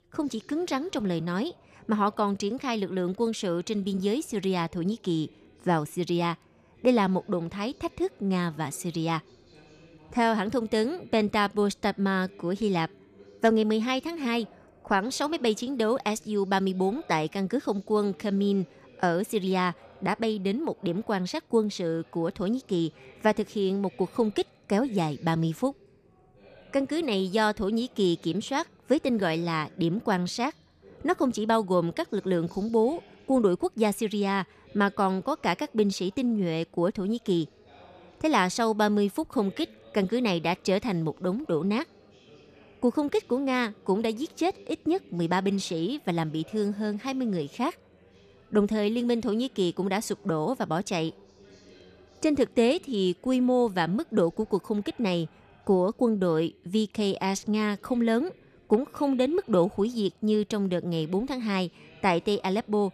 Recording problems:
background chatter; faint; throughout; 3 voices, 25 dB below the speech

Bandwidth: 14.5 kHz